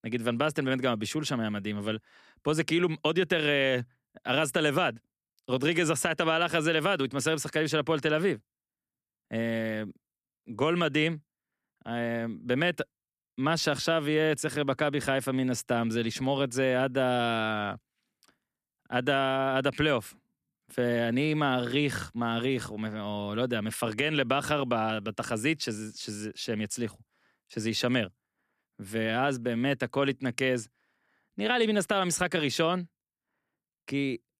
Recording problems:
none

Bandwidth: 14.5 kHz